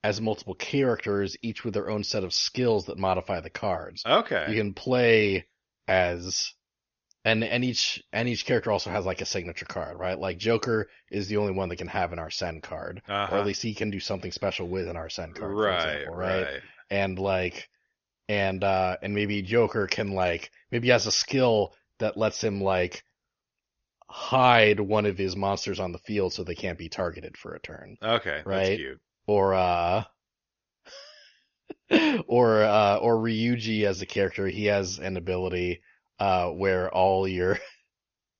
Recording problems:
high frequencies cut off; noticeable; nothing above 6.5 kHz

